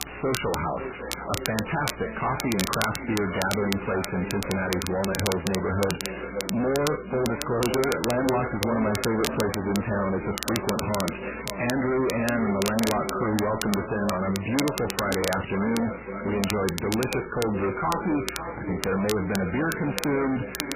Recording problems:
distortion; heavy; 5 dB below the speech
echo of what is said; strong; throughout; 550 ms later, 8 dB below the speech
garbled, watery; badly; nothing above 3 kHz
crackle, like an old record; loud; 7 dB below the speech
electrical hum; faint; throughout; 60 Hz, 25 dB below the speech

